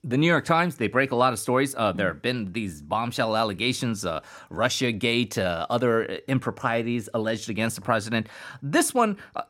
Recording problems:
none

